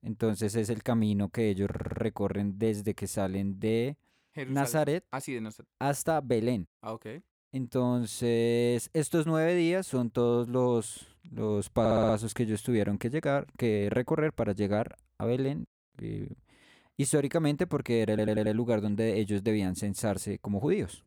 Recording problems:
audio stuttering; at 1.5 s, at 12 s and at 18 s

